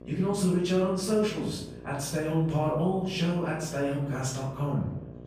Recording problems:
off-mic speech; far
room echo; noticeable; dies away in 0.7 s
electrical hum; noticeable; throughout; 60 Hz, 20 dB below the speech
background chatter; faint; throughout; 4 voices, 25 dB below the speech

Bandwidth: 15 kHz